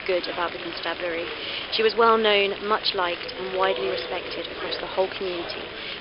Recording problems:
thin; very; fading below 350 Hz
high frequencies cut off; noticeable; nothing above 5.5 kHz
murmuring crowd; loud; throughout; 9 dB below the speech
animal sounds; noticeable; throughout; 15 dB below the speech
hiss; faint; throughout; 25 dB below the speech

